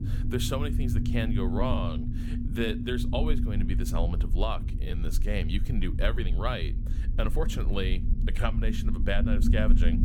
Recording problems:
low rumble; loud; throughout; 7 dB below the speech
uneven, jittery; slightly; from 1.5 to 8.5 s

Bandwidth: 17.5 kHz